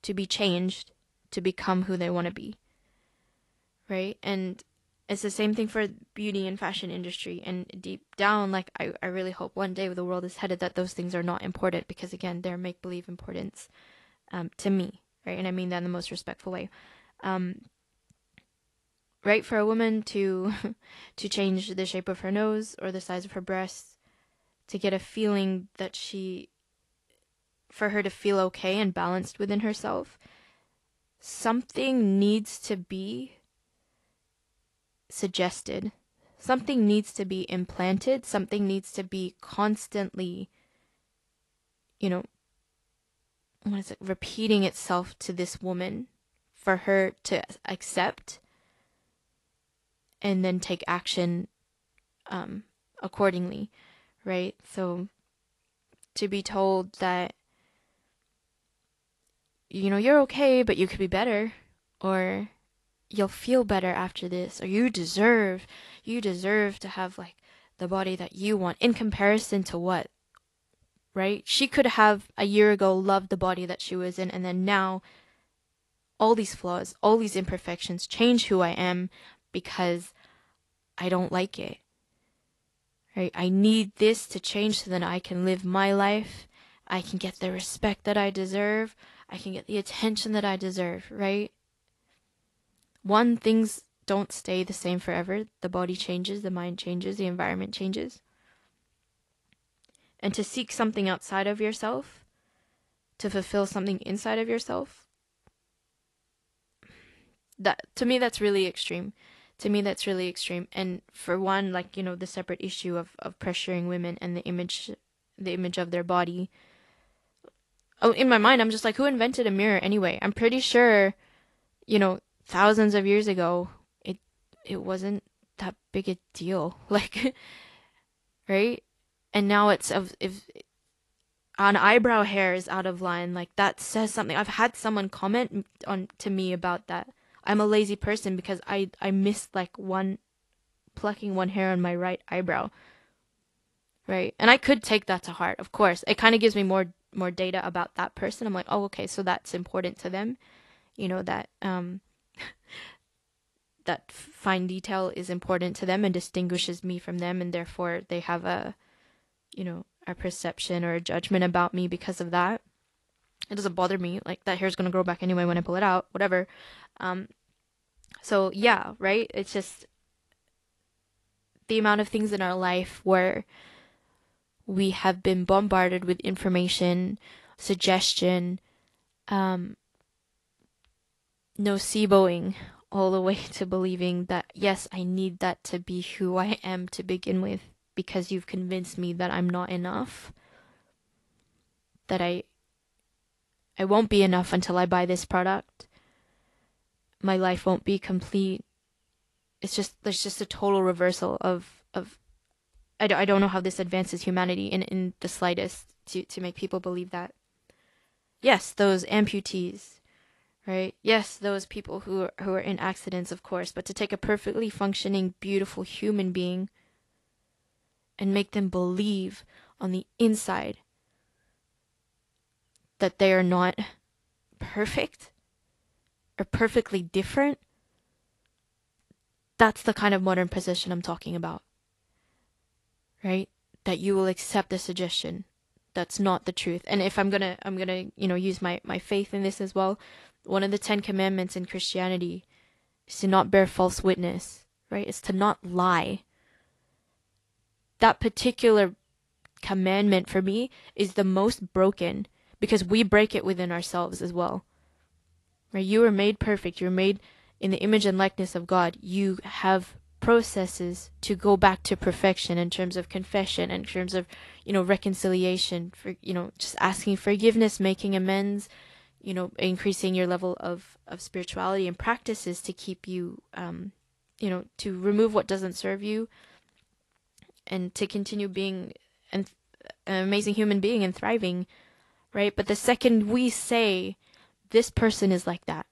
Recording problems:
garbled, watery; slightly; nothing above 11.5 kHz

